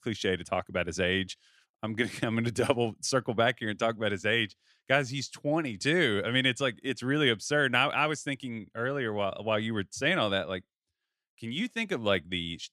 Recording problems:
none

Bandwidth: 14 kHz